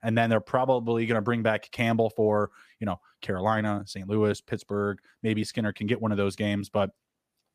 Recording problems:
none

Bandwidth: 15 kHz